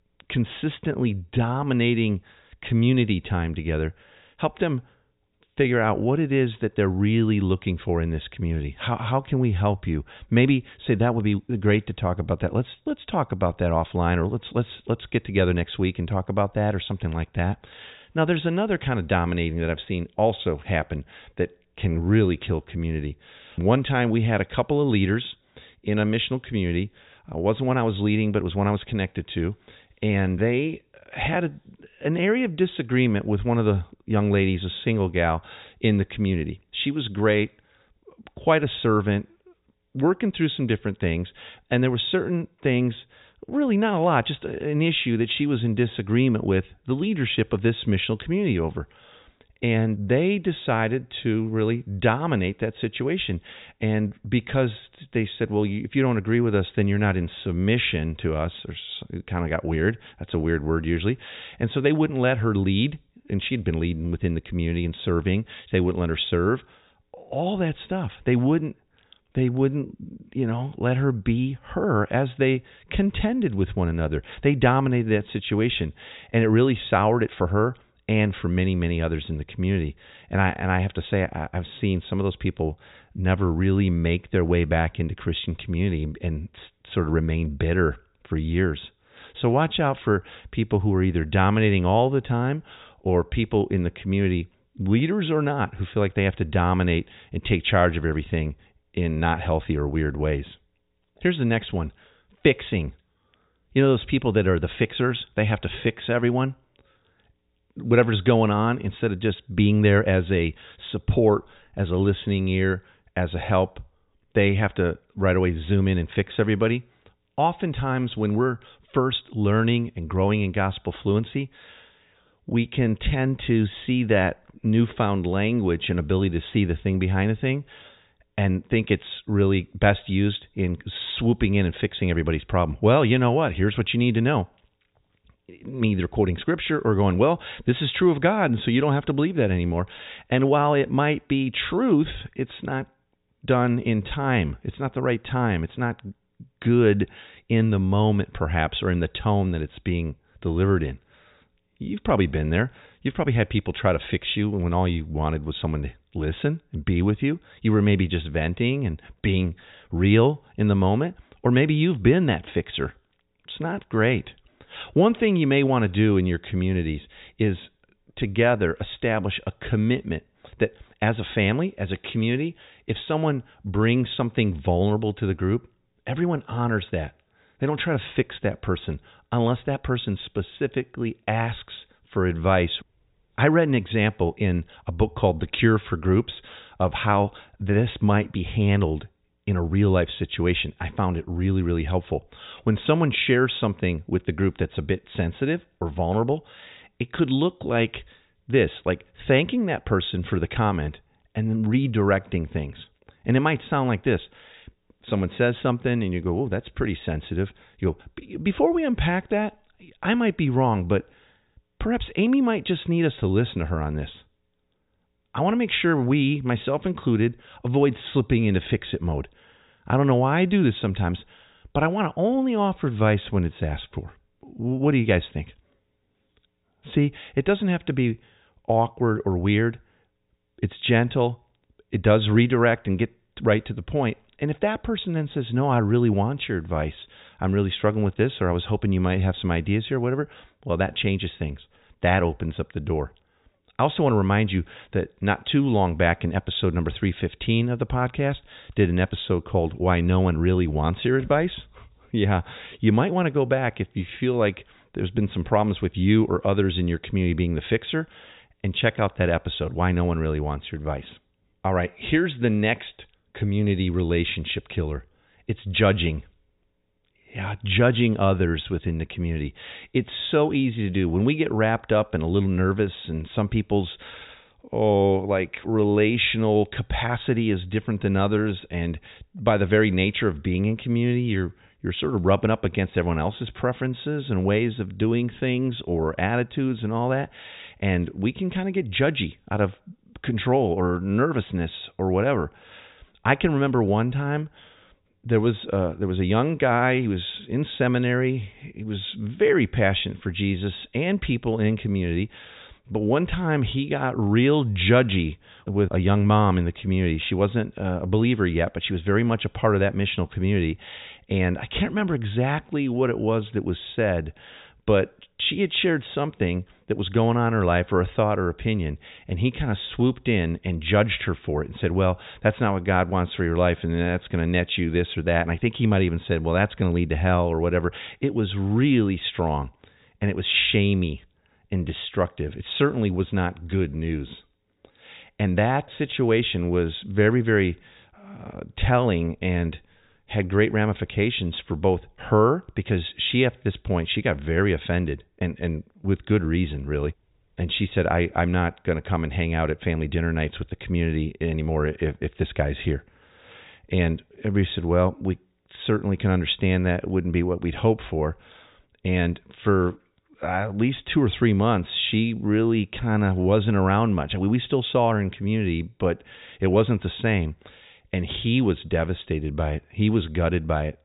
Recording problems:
high frequencies cut off; severe; nothing above 4 kHz

